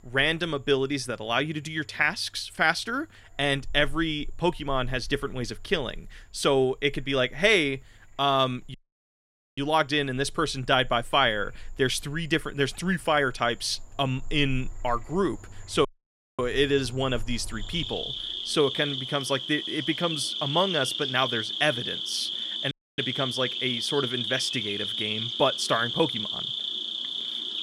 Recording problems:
animal sounds; loud; throughout; 3 dB below the speech
audio cutting out; at 8.5 s for 1 s, at 16 s for 0.5 s and at 23 s

